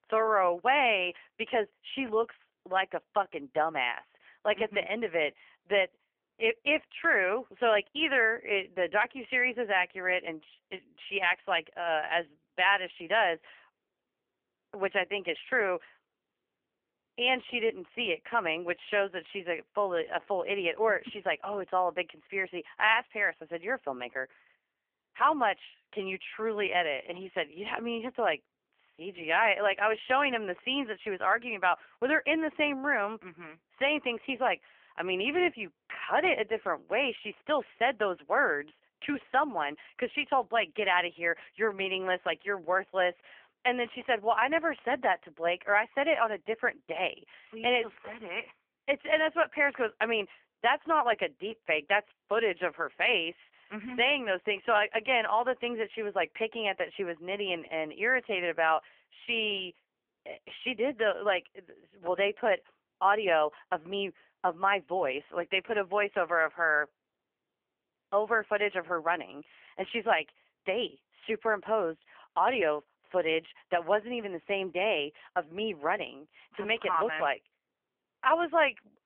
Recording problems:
phone-call audio; poor line; nothing above 3 kHz

